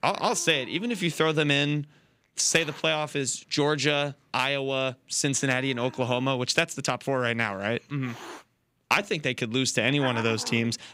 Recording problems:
hiss; noticeable; throughout; 15 dB below the speech

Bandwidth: 15.5 kHz